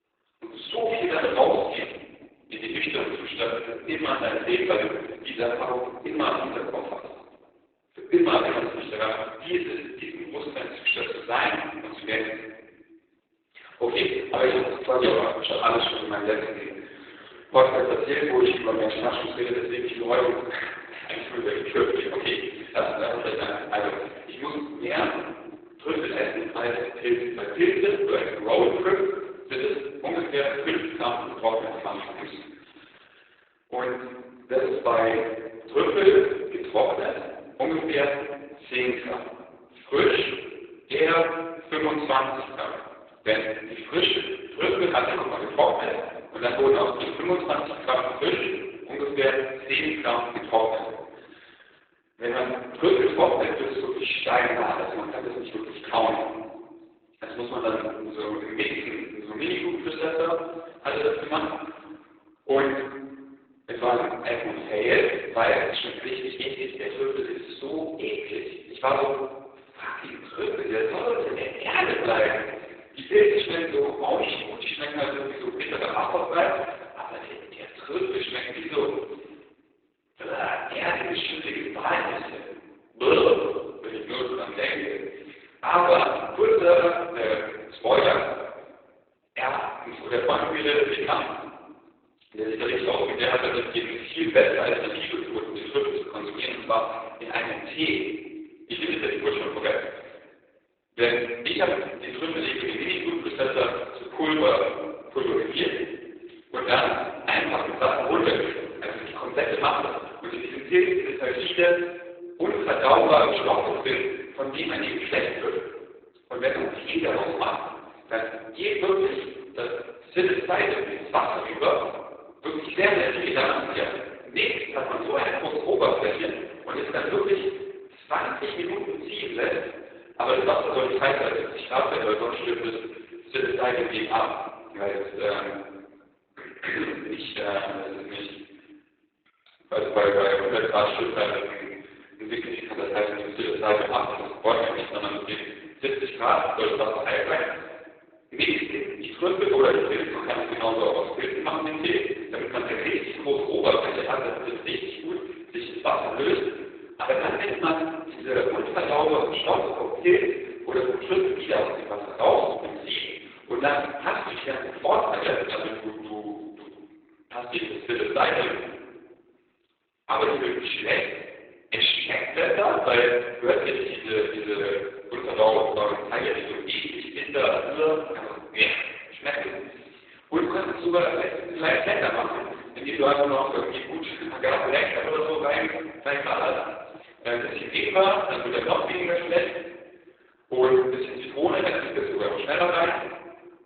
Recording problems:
off-mic speech; far
garbled, watery; badly; nothing above 4 kHz
thin; very; fading below 350 Hz
room echo; noticeable; dies away in 1.1 s

